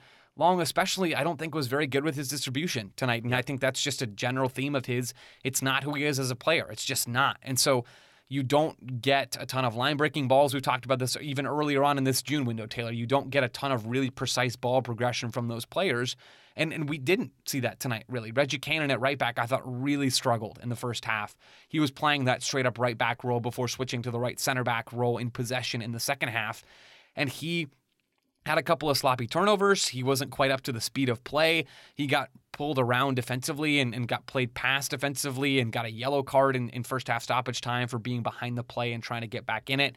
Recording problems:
none

